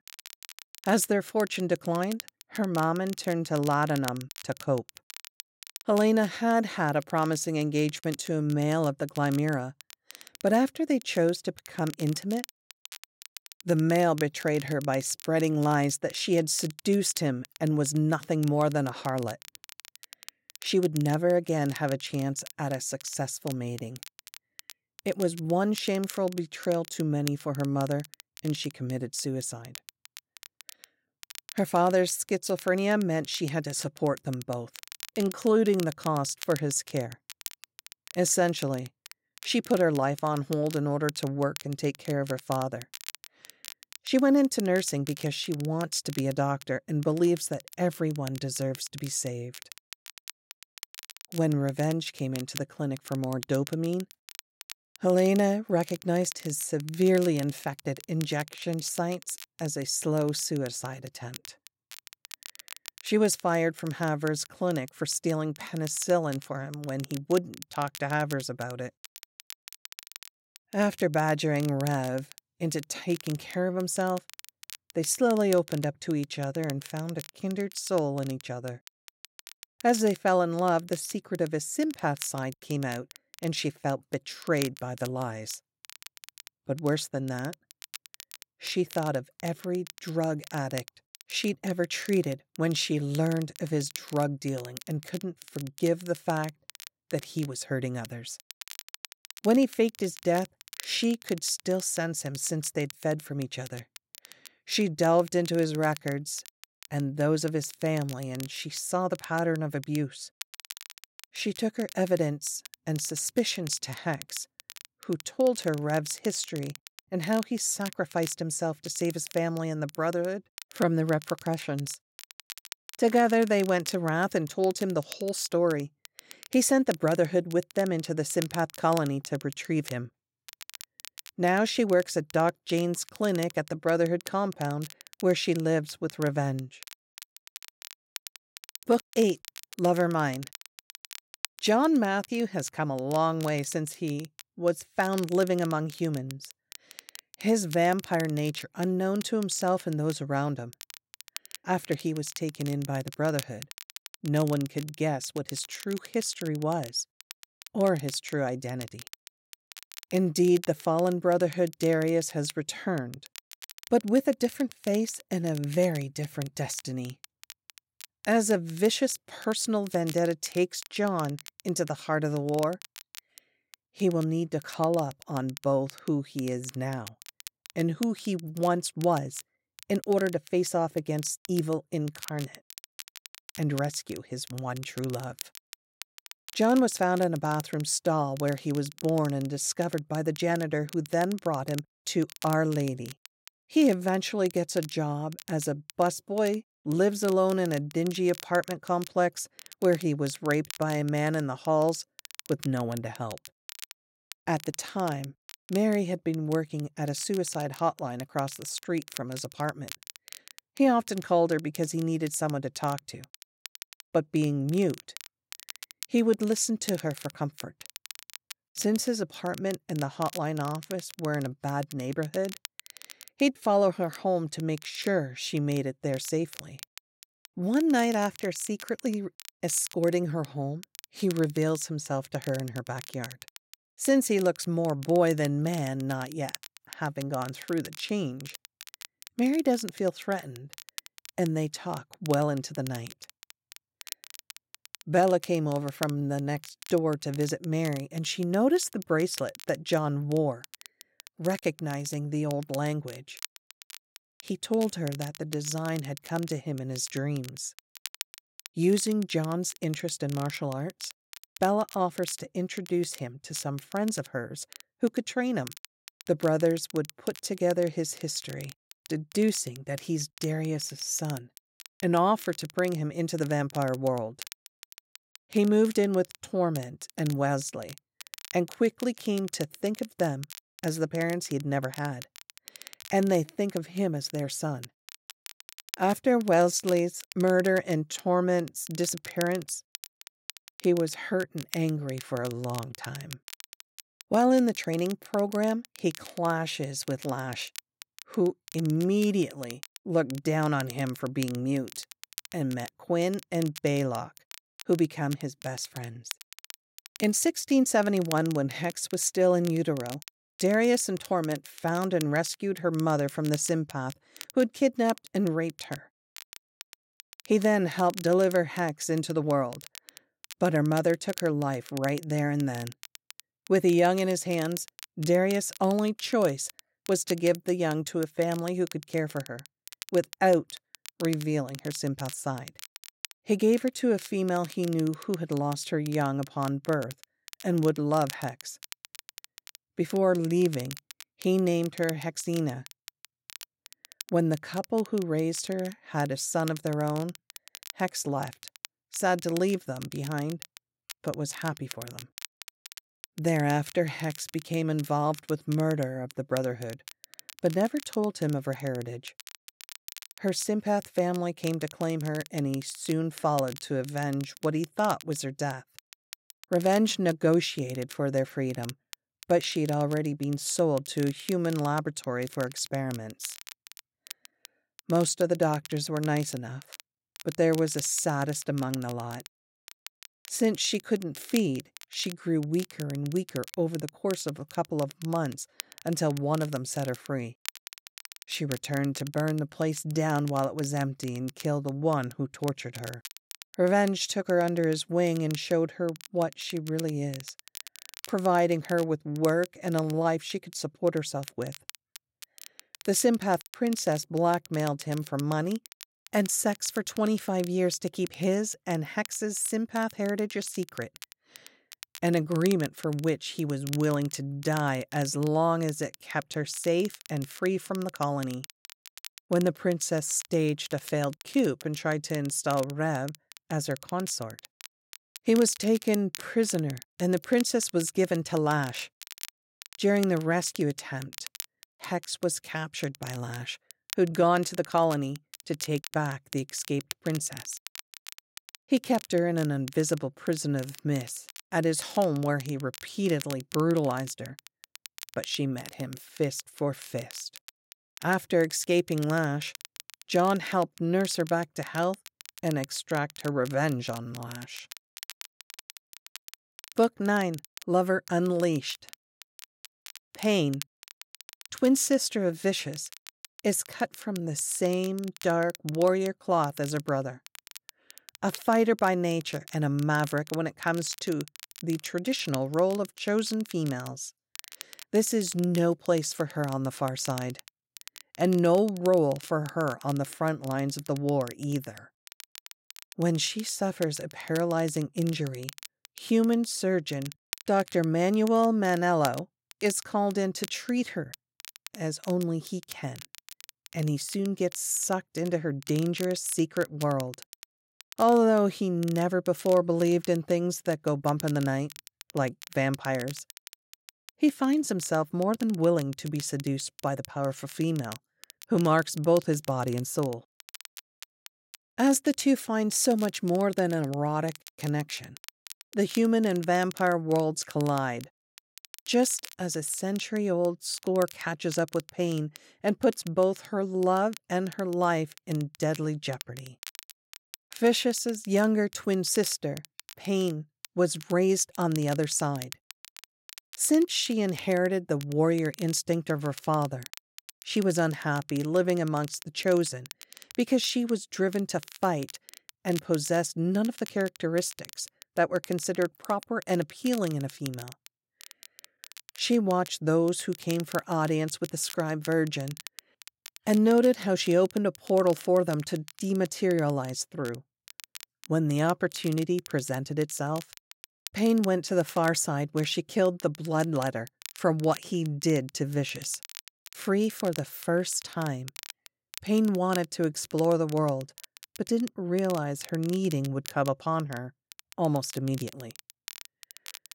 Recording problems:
crackle, like an old record; noticeable; 15 dB below the speech

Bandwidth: 16 kHz